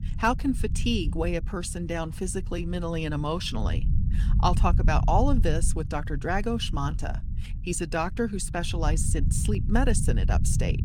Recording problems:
low rumble; noticeable; throughout; 15 dB below the speech

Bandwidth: 17 kHz